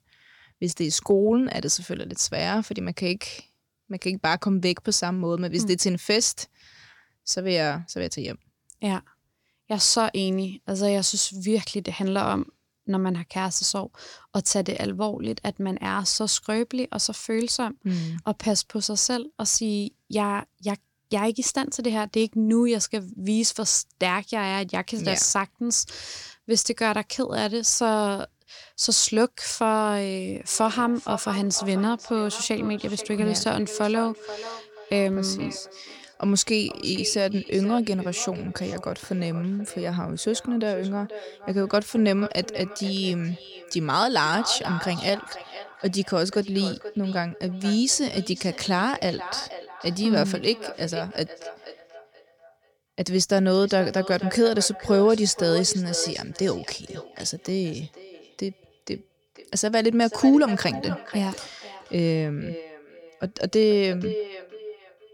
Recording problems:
echo of what is said; noticeable; from 30 s on; 480 ms later, 15 dB below the speech

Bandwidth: 18 kHz